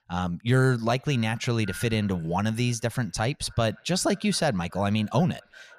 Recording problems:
echo of what is said; faint; throughout; 550 ms later, 25 dB below the speech

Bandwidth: 14.5 kHz